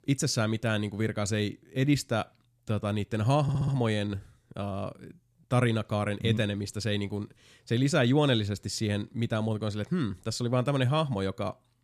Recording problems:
audio stuttering; at 3.5 s

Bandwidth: 14.5 kHz